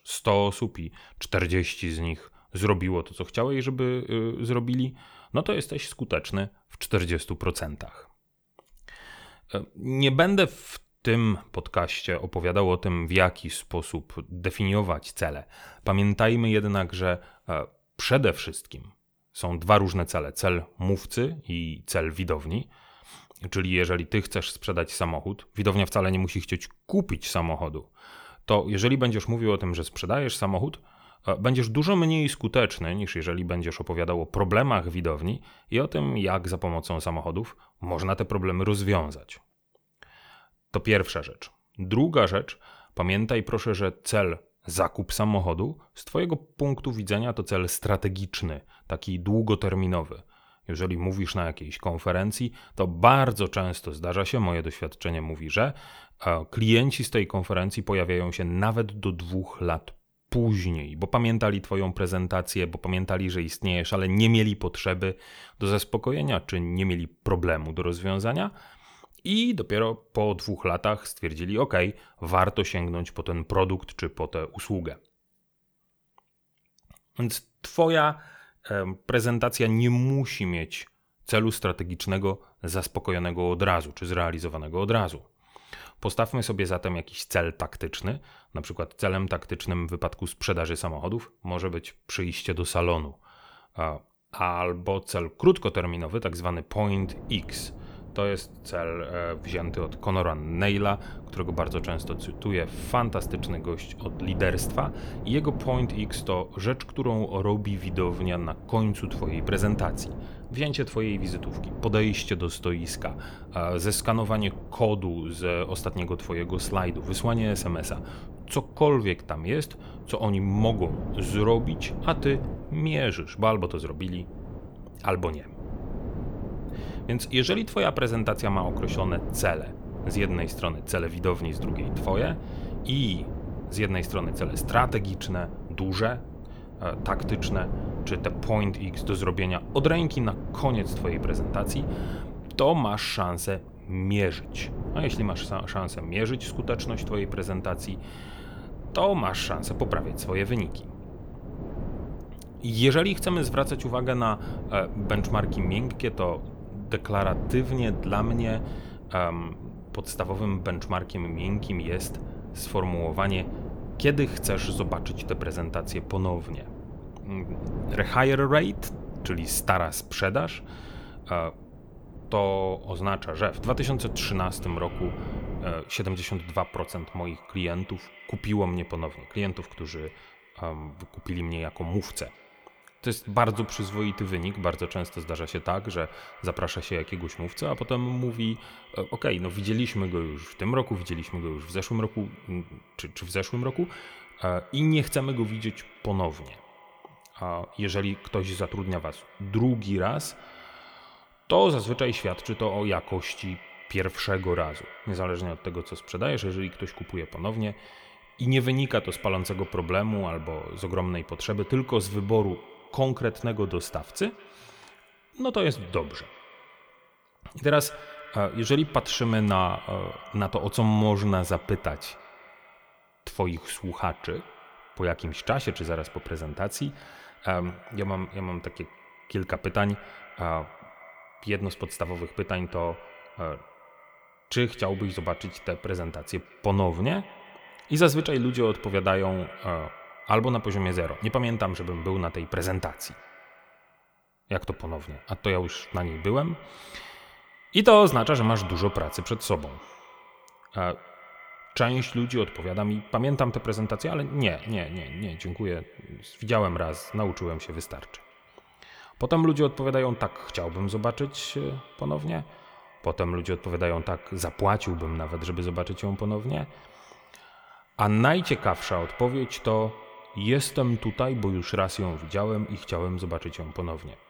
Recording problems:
echo of what is said; faint; from 2:55 on; 170 ms later, 20 dB below the speech
wind noise on the microphone; occasional gusts; from 1:37 to 2:56; 15 dB below the speech

